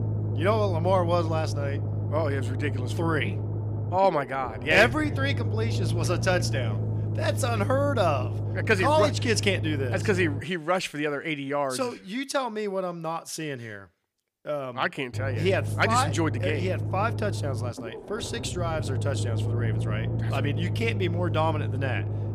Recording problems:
low rumble; noticeable; until 10 s and from 15 s on; 15 dB below the speech

